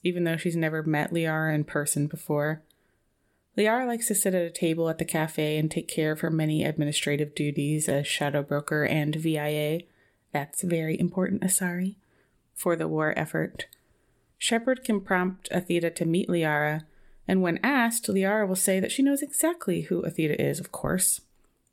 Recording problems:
uneven, jittery; slightly; from 7.5 to 15 s

